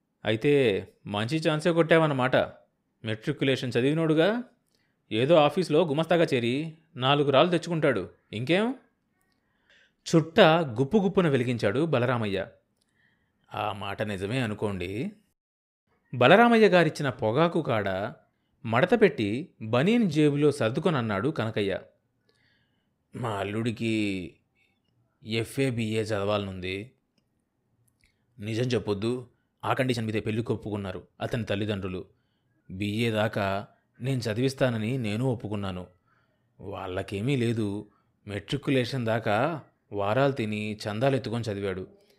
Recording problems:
uneven, jittery; strongly; from 1 to 40 s

